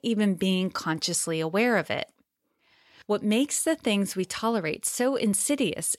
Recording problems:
none

